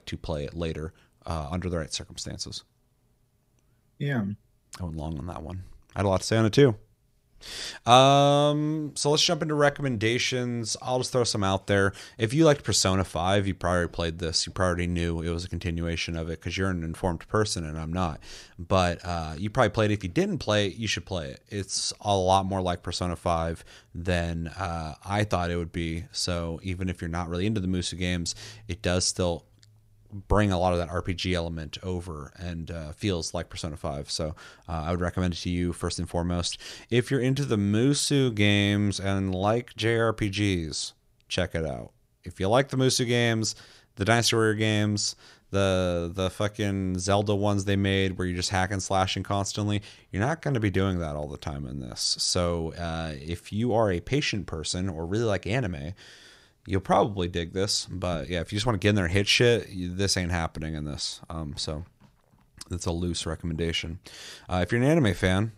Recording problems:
none

